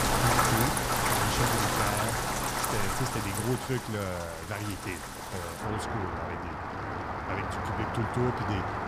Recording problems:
rain or running water; very loud; throughout; 5 dB above the speech

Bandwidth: 15 kHz